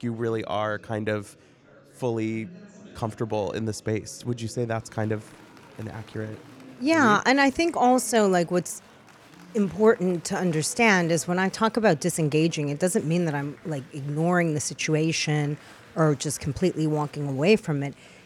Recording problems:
murmuring crowd; faint; throughout; 25 dB below the speech

